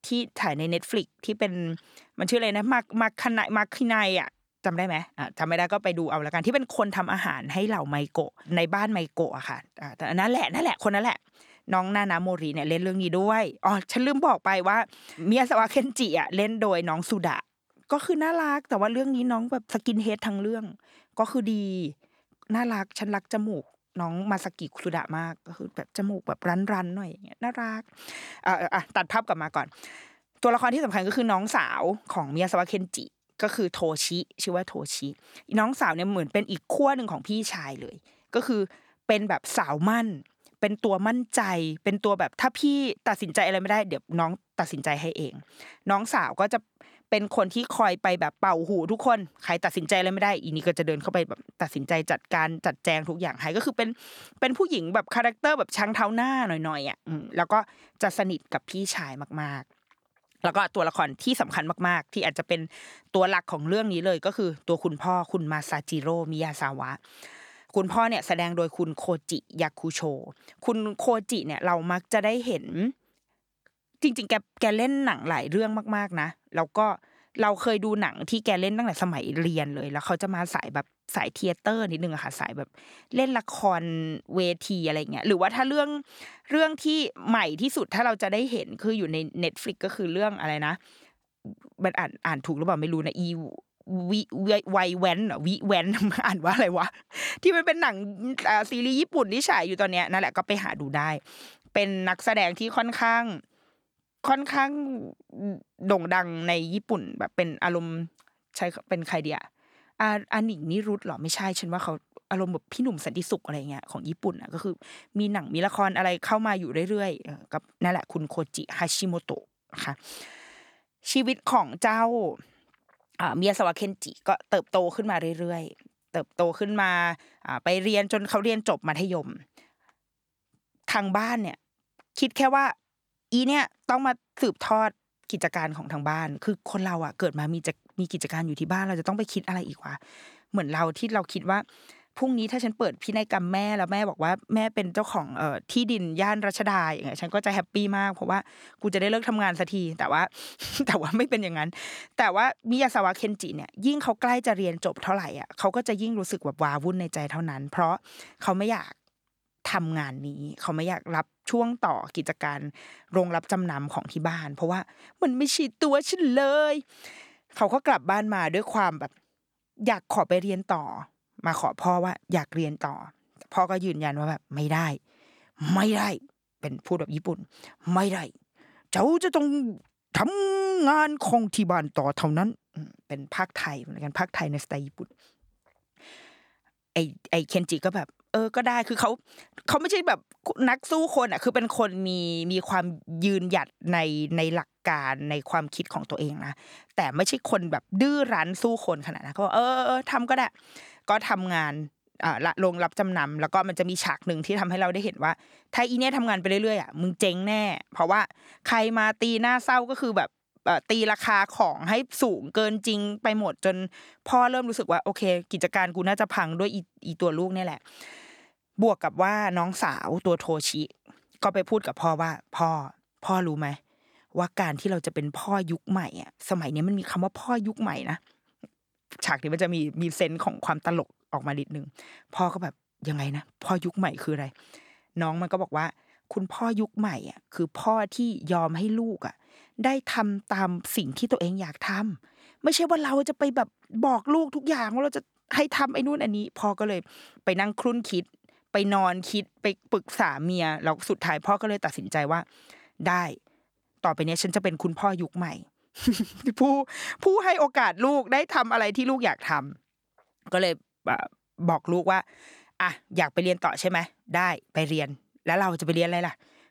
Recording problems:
none

